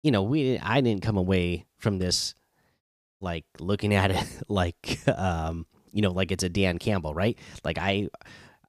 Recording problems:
none

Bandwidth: 15 kHz